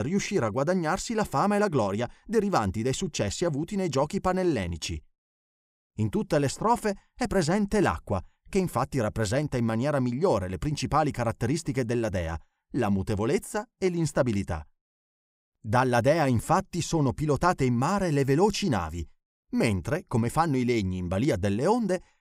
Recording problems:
abrupt cut into speech; at the start

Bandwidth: 15.5 kHz